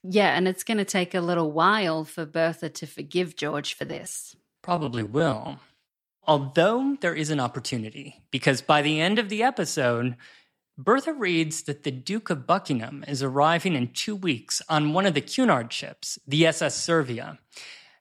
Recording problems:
choppy; very; from 3.5 to 5.5 s; 16% of the speech affected

